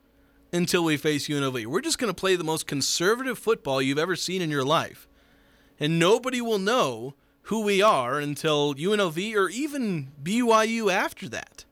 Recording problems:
none

